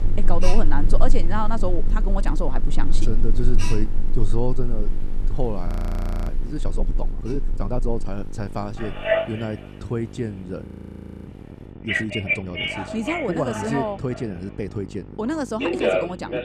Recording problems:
alarms or sirens; very loud; throughout; 2 dB above the speech
electrical hum; noticeable; throughout; 50 Hz, 15 dB below the speech
rain or running water; faint; throughout; 25 dB below the speech
train or aircraft noise; faint; throughout; 25 dB below the speech
audio freezing; at 5.5 s for 0.5 s and at 11 s for 0.5 s

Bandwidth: 14.5 kHz